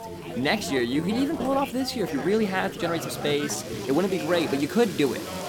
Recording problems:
background chatter; loud; throughout; 3 voices, 9 dB below the speech
rain or running water; noticeable; throughout; 15 dB below the speech
uneven, jittery; strongly; from 0.5 to 4.5 s

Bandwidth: 18.5 kHz